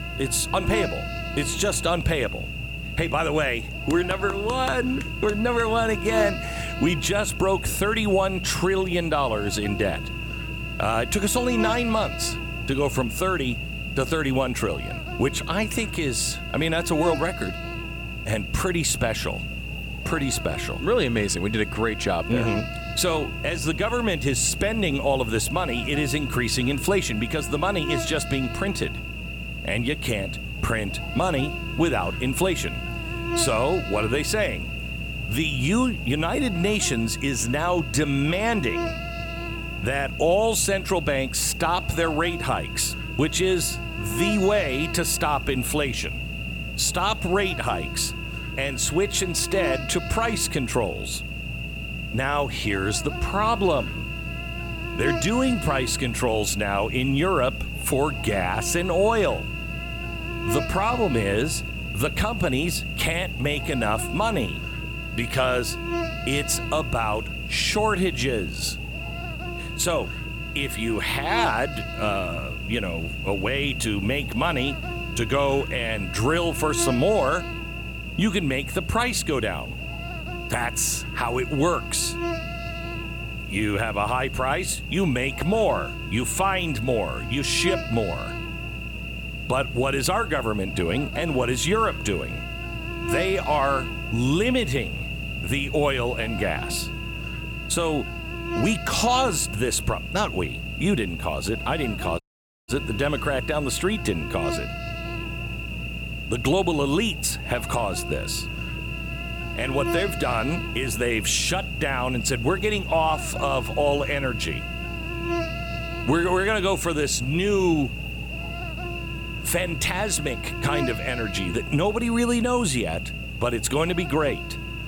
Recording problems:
electrical hum; loud; throughout; 60 Hz, 7 dB below the speech
audio cutting out; at 1:42

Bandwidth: 17.5 kHz